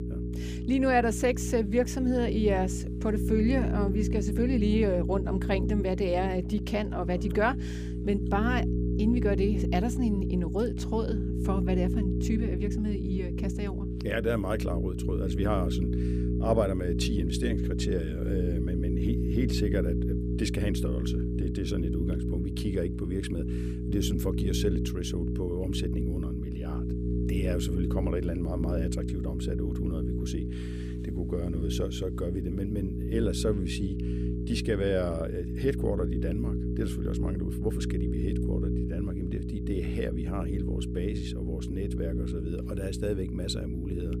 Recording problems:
electrical hum; loud; throughout; 60 Hz, 5 dB below the speech

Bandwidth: 15 kHz